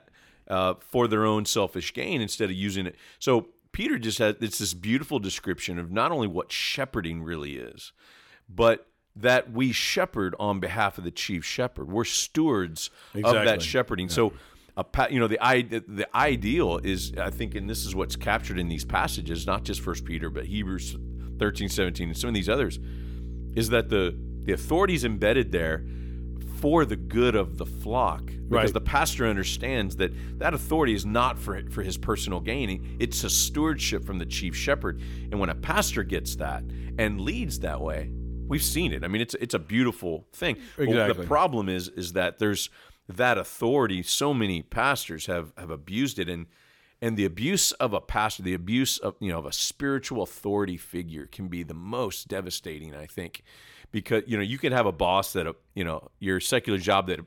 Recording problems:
electrical hum; faint; from 16 to 39 s; 60 Hz, 20 dB below the speech

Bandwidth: 17.5 kHz